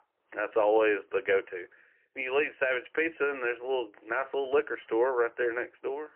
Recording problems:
phone-call audio; poor line; nothing above 3 kHz

